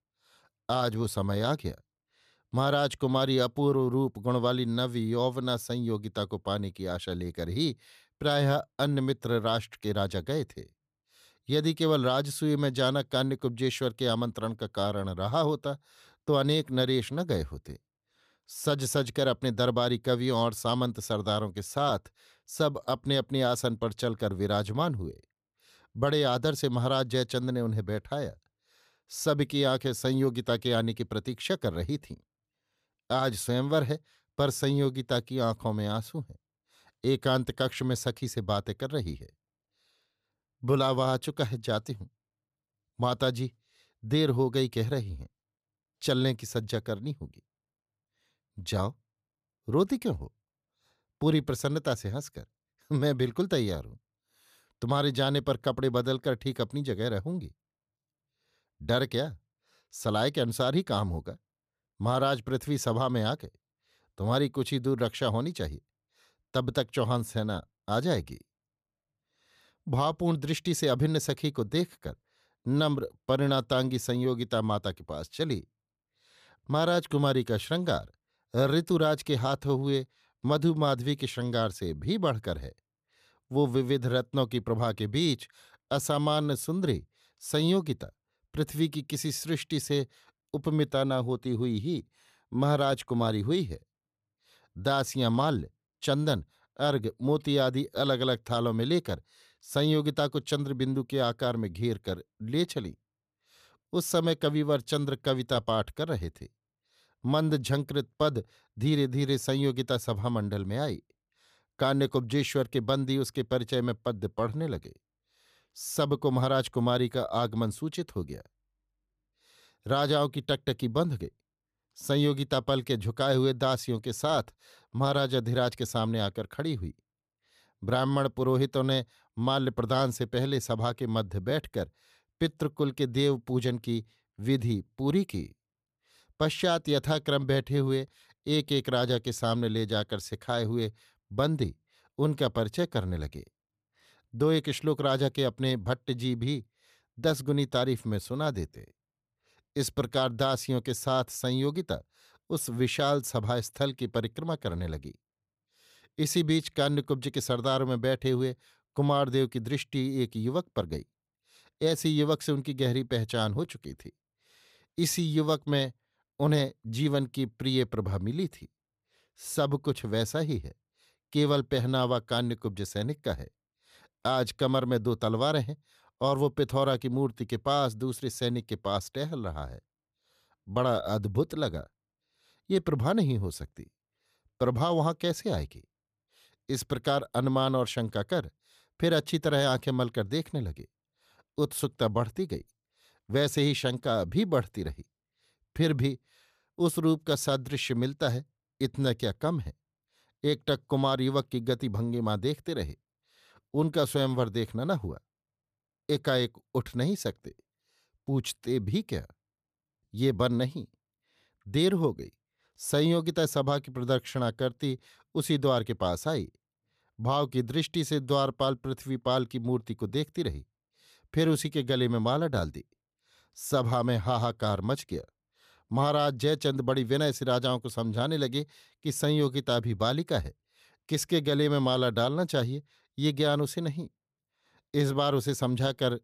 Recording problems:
none

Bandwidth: 14.5 kHz